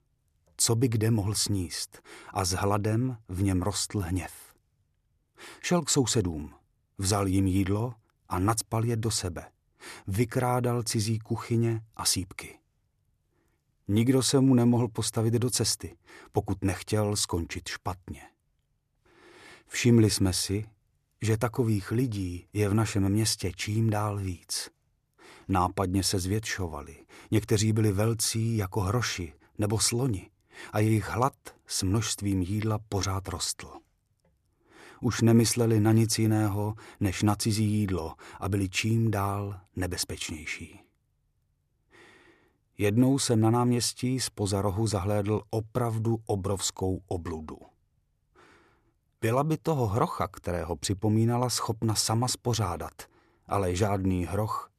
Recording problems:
none

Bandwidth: 13.5 kHz